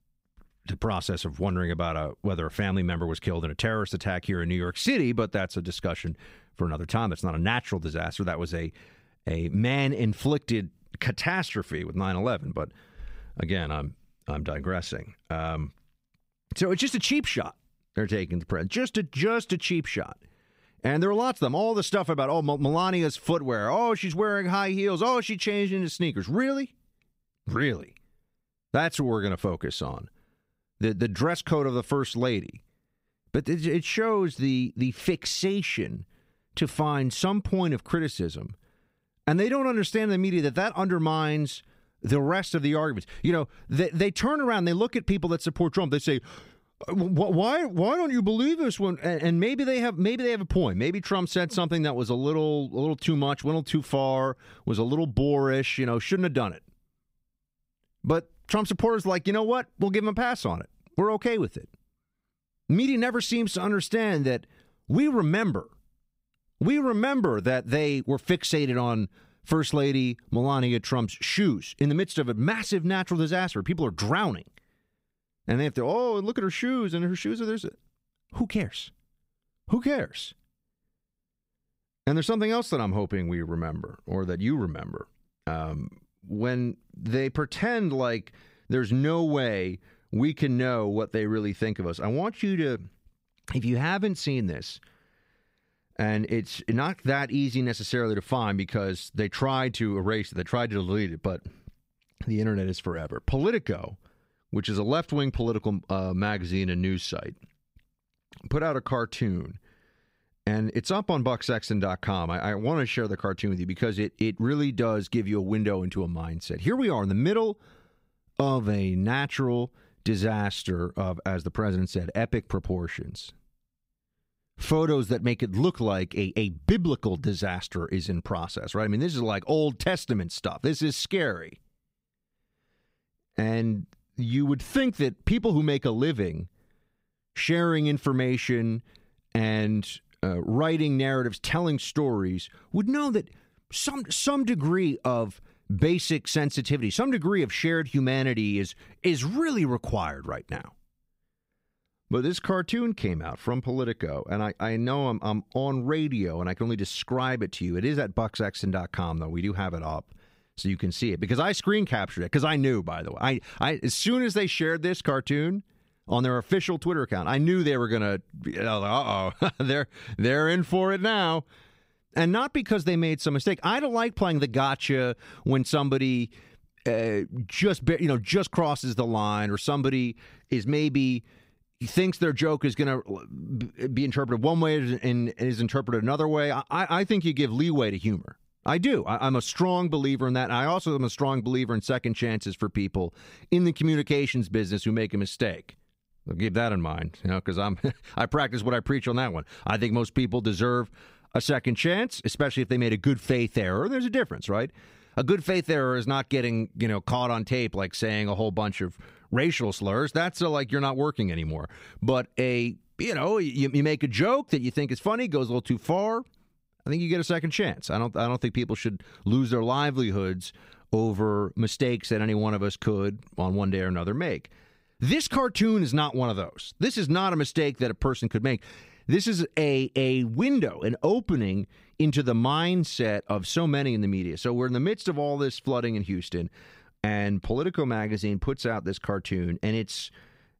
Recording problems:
none

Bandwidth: 15.5 kHz